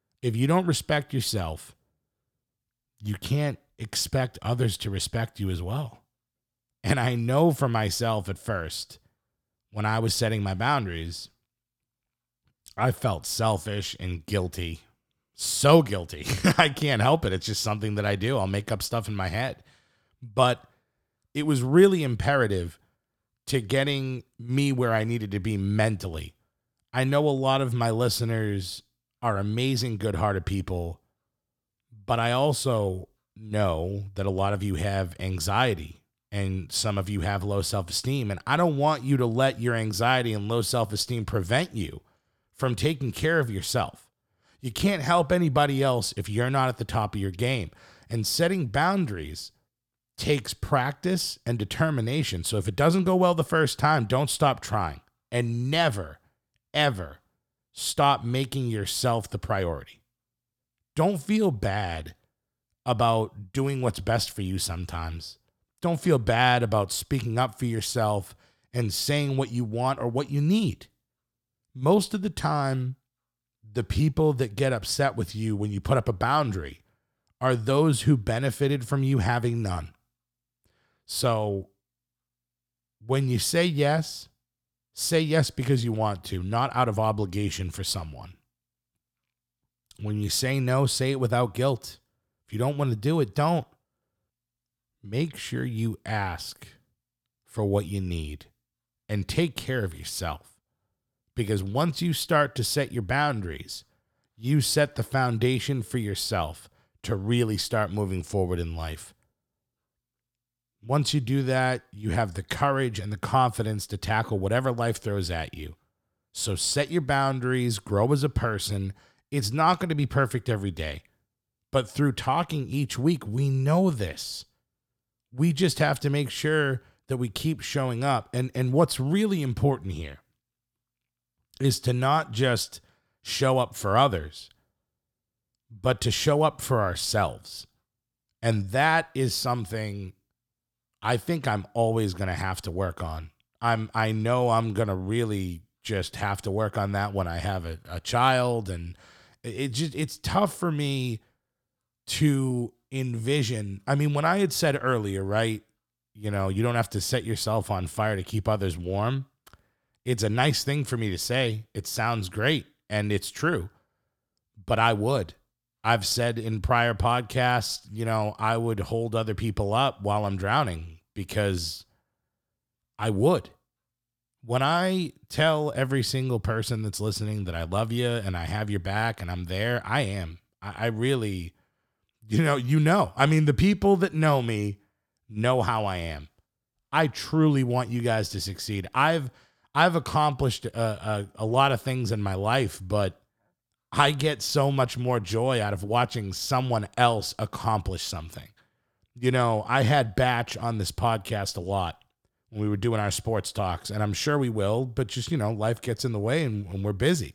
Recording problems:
none

